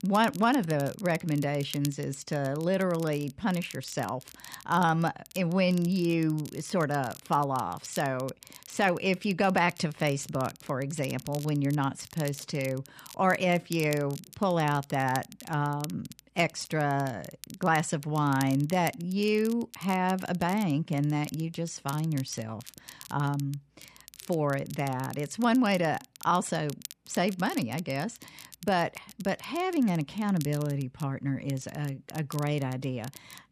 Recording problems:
crackle, like an old record; noticeable; 20 dB below the speech

